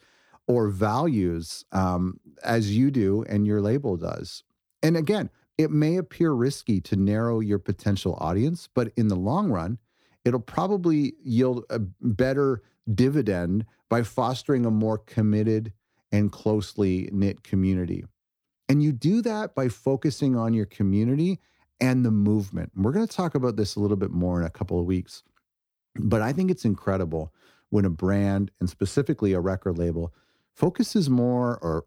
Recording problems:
none

